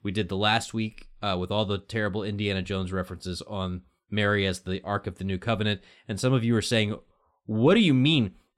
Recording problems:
none

